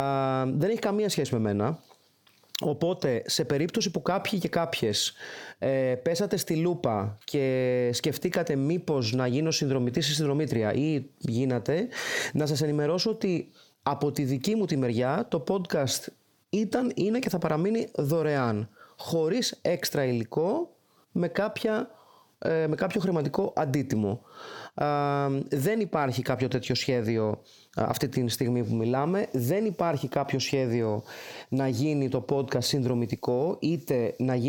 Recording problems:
squashed, flat; heavily
abrupt cut into speech; at the start and the end

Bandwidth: 18.5 kHz